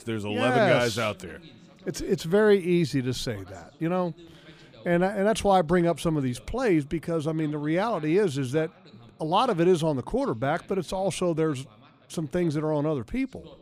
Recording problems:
voice in the background; faint; throughout; 25 dB below the speech

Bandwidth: 15 kHz